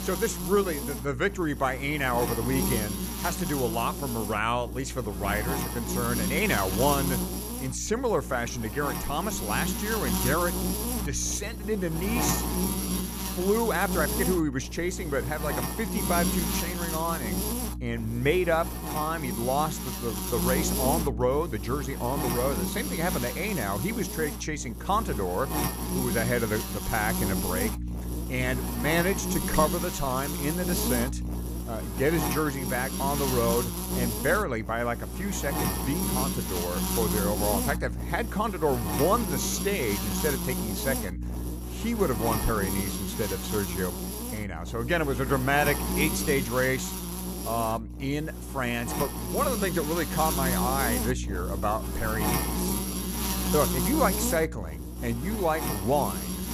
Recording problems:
electrical hum; loud; throughout; 60 Hz, 5 dB below the speech

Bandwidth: 14.5 kHz